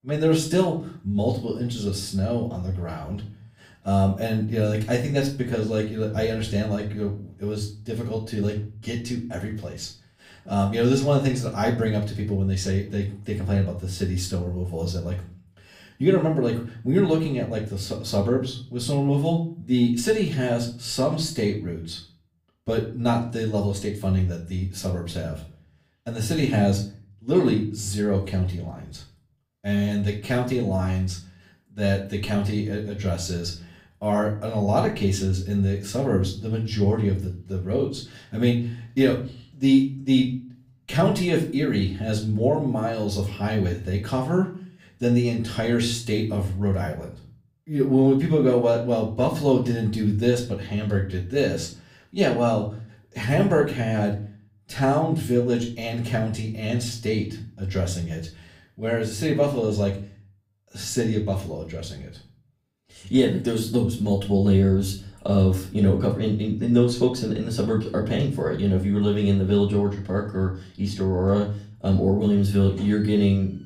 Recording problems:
off-mic speech; far
room echo; slight; dies away in 0.4 s

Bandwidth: 15.5 kHz